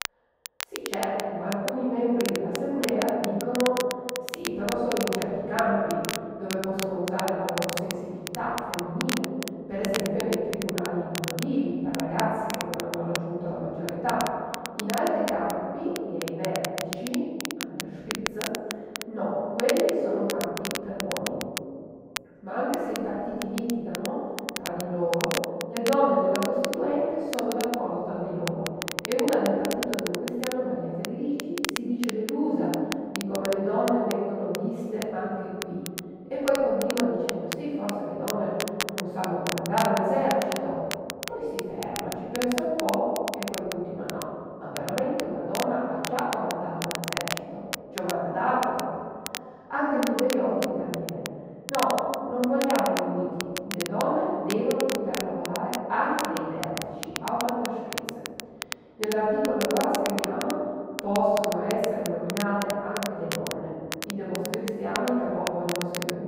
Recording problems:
room echo; strong; dies away in 2.2 s
off-mic speech; far
muffled; very; fading above 2.5 kHz
crackle, like an old record; loud; 7 dB below the speech

